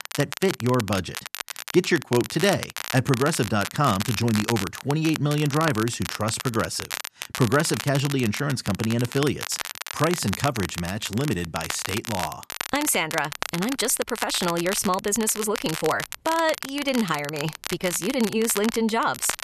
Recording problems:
crackle, like an old record; loud; 8 dB below the speech

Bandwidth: 13.5 kHz